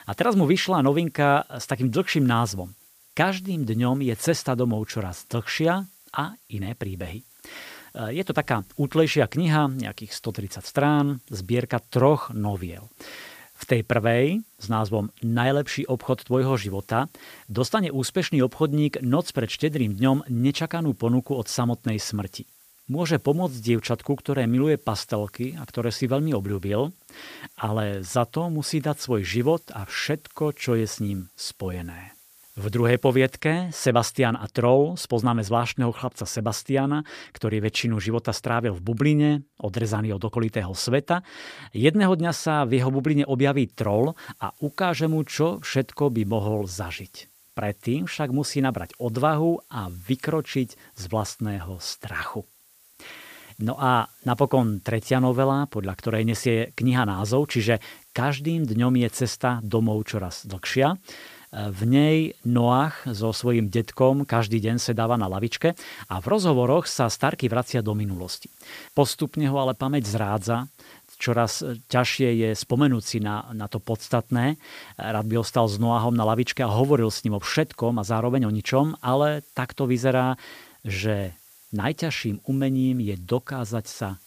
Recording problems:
hiss; faint; until 33 s and from 44 s on; 25 dB below the speech

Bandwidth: 15 kHz